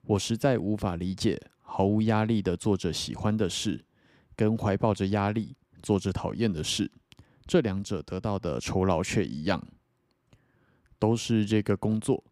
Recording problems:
none

